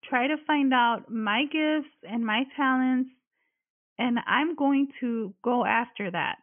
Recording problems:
high frequencies cut off; severe; nothing above 3.5 kHz

